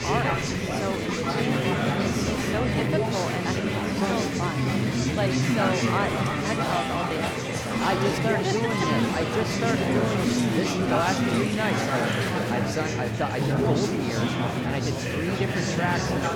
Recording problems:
chatter from many people; very loud; throughout; 5 dB above the speech

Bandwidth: 18 kHz